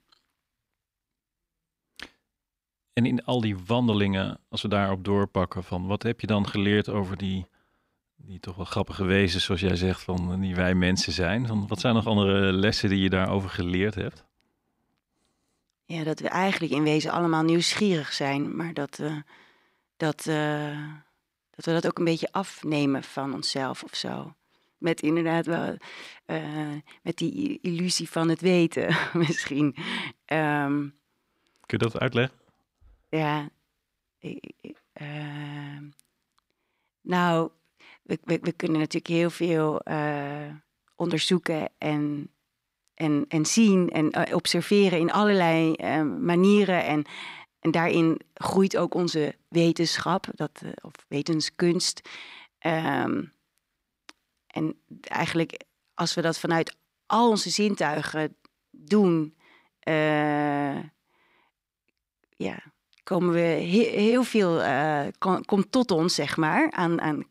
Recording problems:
none

